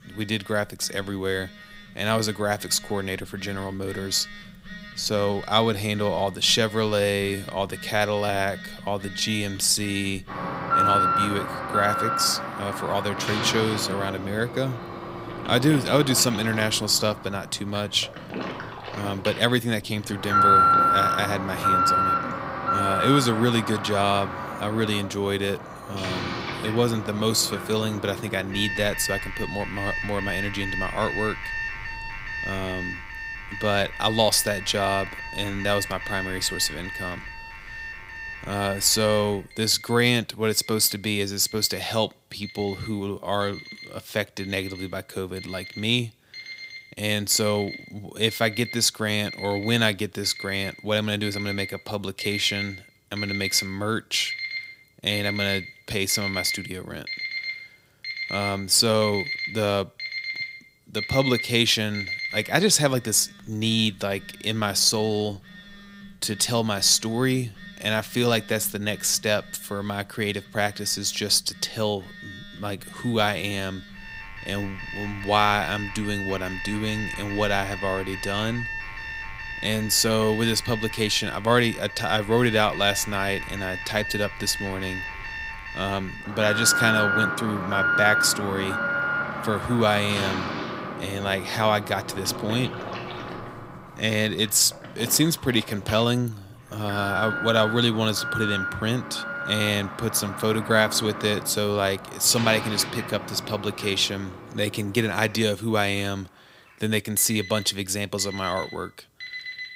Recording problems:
alarms or sirens; loud; throughout; 5 dB below the speech

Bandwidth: 15.5 kHz